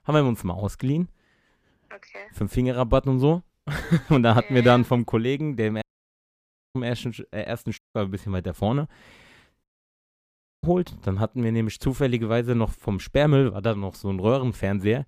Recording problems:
audio cutting out; at 6 s for 1 s, at 8 s and at 9.5 s for 1 s

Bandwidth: 15 kHz